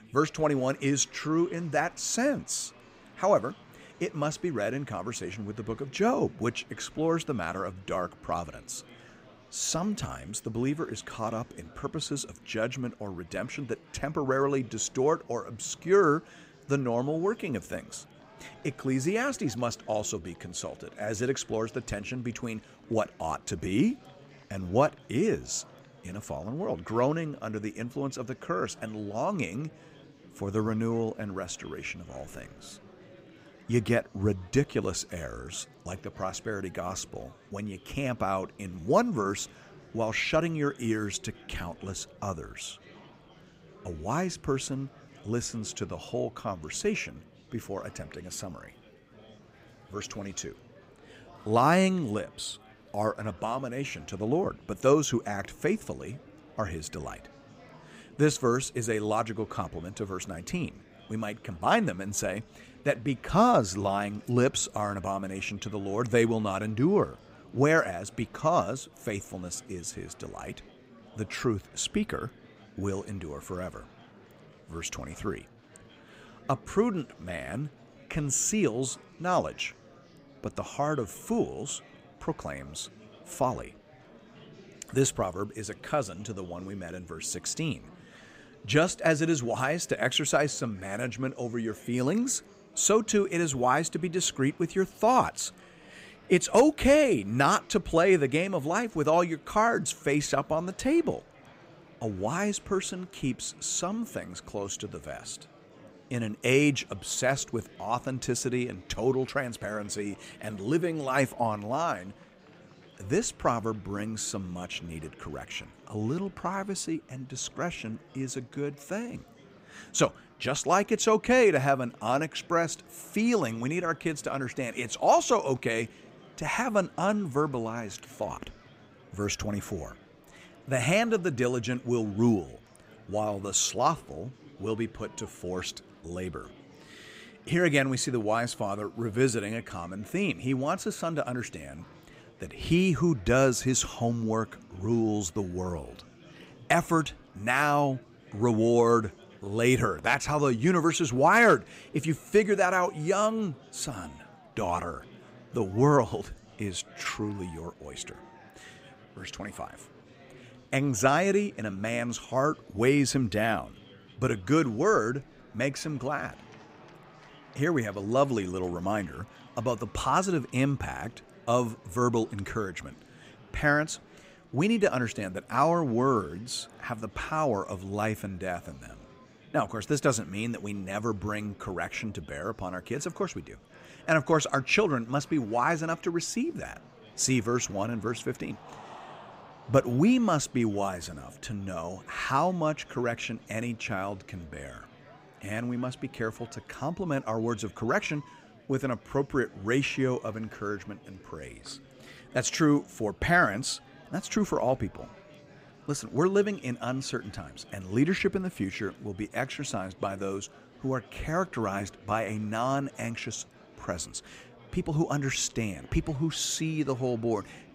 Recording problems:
murmuring crowd; faint; throughout; 25 dB below the speech

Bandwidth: 15.5 kHz